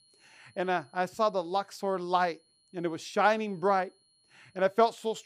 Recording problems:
high-pitched whine; faint; throughout; 4 kHz, 35 dB below the speech

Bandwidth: 15 kHz